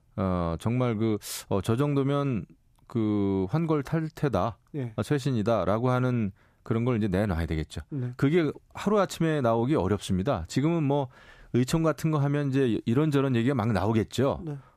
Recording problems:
none

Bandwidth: 14.5 kHz